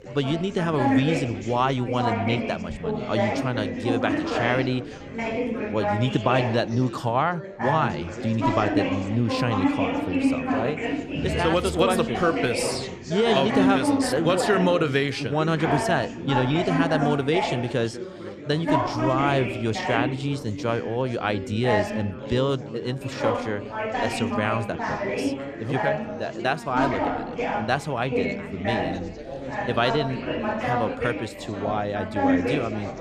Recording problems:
chatter from many people; loud; throughout; 2 dB below the speech

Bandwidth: 14.5 kHz